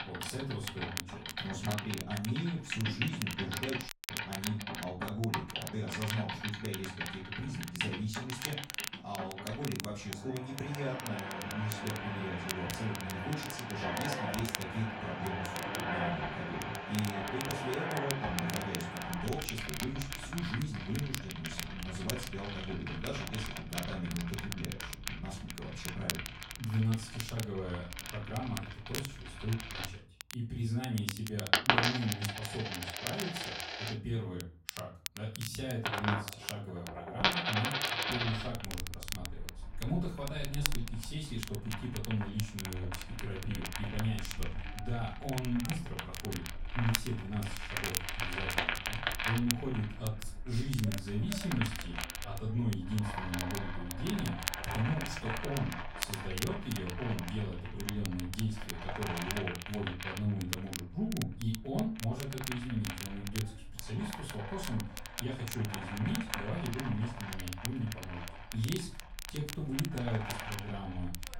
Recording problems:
off-mic speech; far
room echo; slight; dies away in 0.3 s
household noises; loud; throughout; 1 dB below the speech
crackle, like an old record; loud; 5 dB below the speech
audio cutting out; at 4 s

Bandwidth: 16 kHz